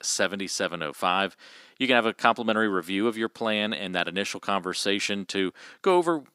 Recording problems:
thin; somewhat; fading below 250 Hz

